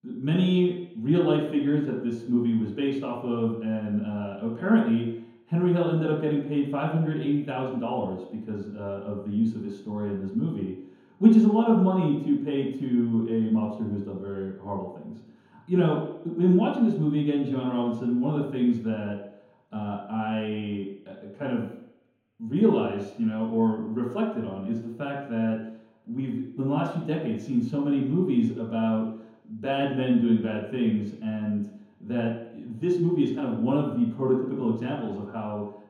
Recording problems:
off-mic speech; far
room echo; noticeable; dies away in 0.9 s

